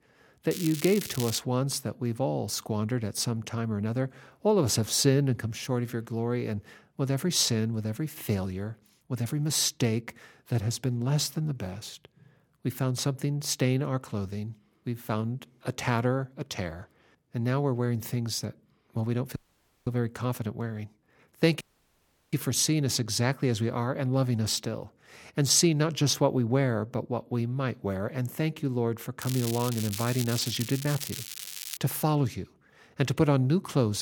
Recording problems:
crackling; loud; at 0.5 s and from 29 to 32 s; 8 dB below the speech
audio cutting out; at 19 s for 0.5 s and at 22 s for 0.5 s
abrupt cut into speech; at the end

